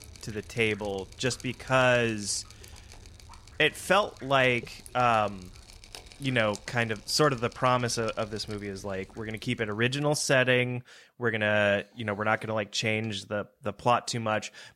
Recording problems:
rain or running water; faint; until 10 s; 20 dB below the speech

